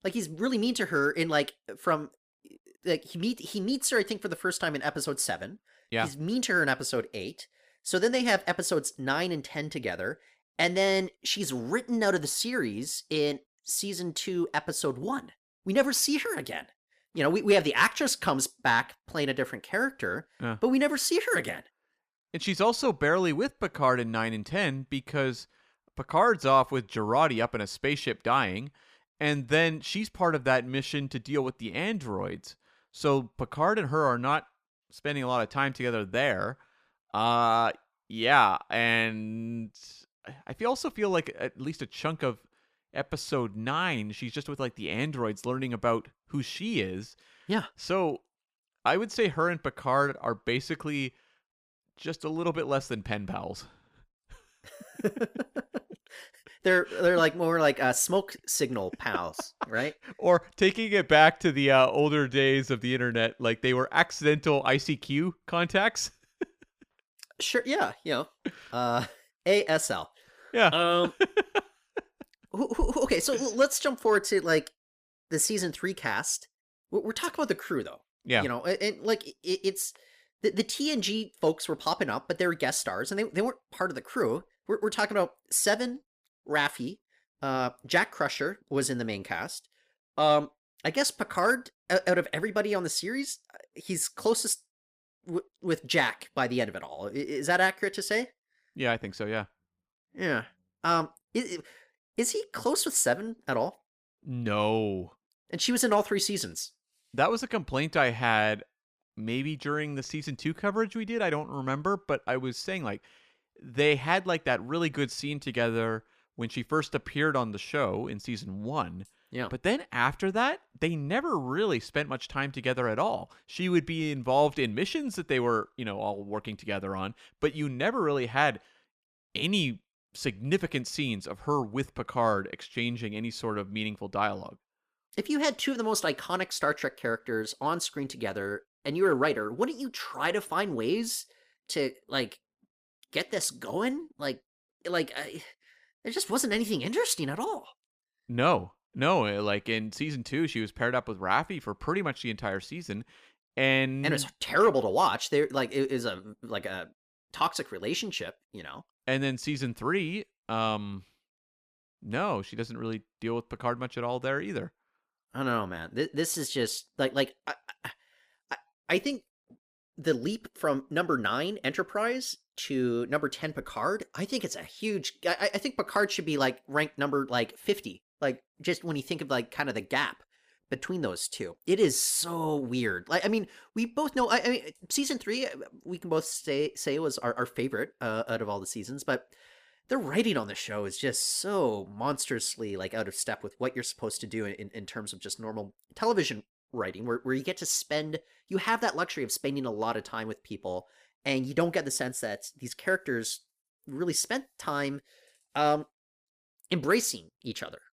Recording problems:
none

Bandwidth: 15 kHz